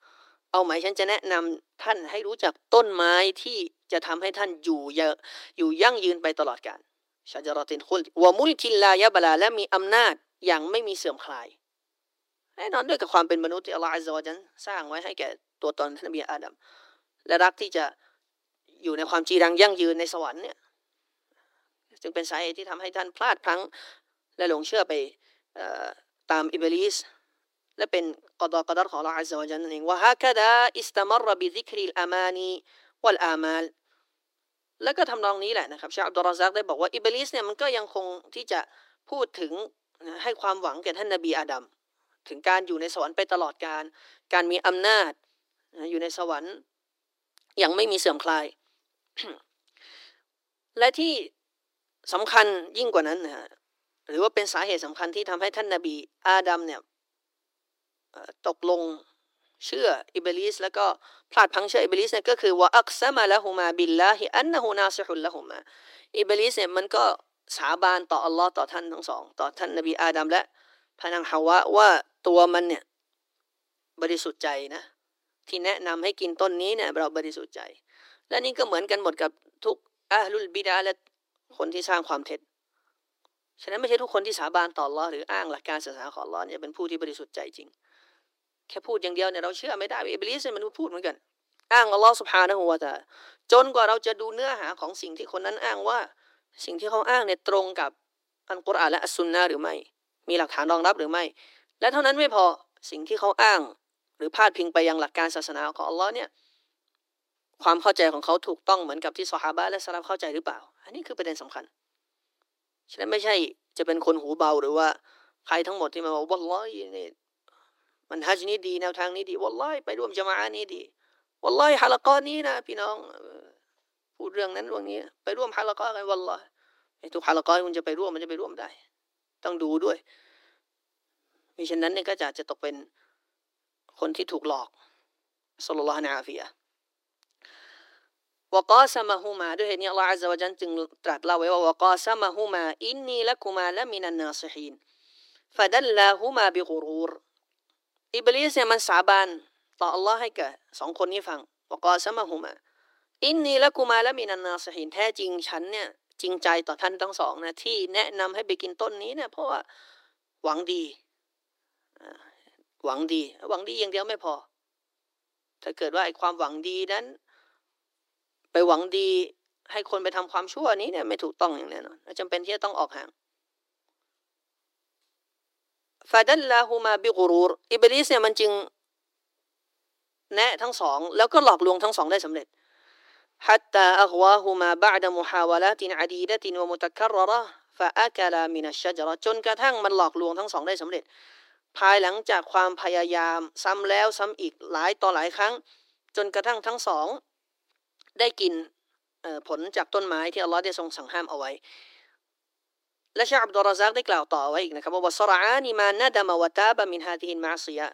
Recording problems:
thin; very; fading below 300 Hz

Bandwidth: 16 kHz